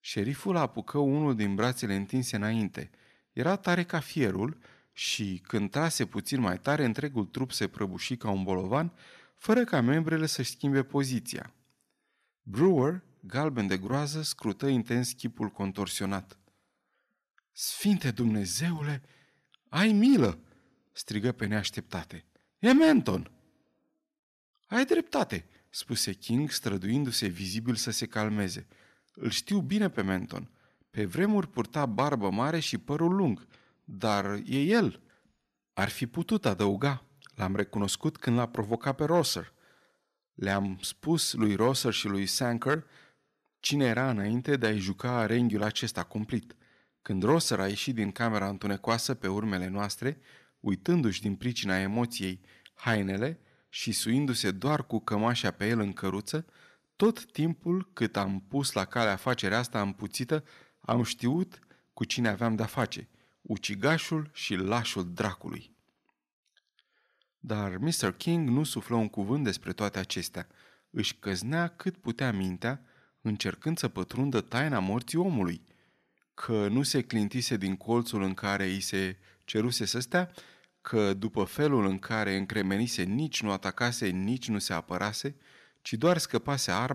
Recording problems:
abrupt cut into speech; at the end

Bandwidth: 14 kHz